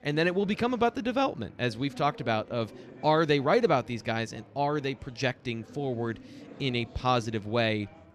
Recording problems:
chatter from many people; faint; throughout; 20 dB below the speech

